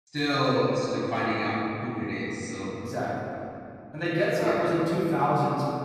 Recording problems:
room echo; strong; dies away in 2.7 s
off-mic speech; far

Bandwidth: 15 kHz